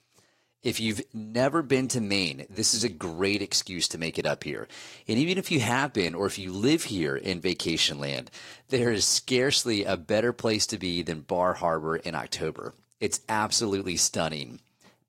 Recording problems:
garbled, watery; slightly; nothing above 15.5 kHz

